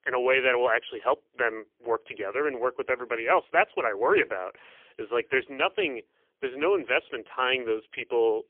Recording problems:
phone-call audio; poor line; nothing above 3 kHz

